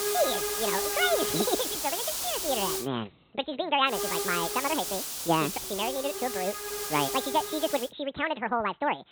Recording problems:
high frequencies cut off; severe; nothing above 4 kHz
wrong speed and pitch; too fast and too high; 1.7 times normal speed
hiss; loud; until 3 s and from 4 to 8 s; 1 dB below the speech

